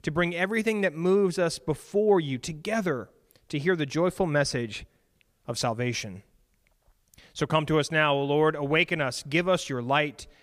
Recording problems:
none

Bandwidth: 15 kHz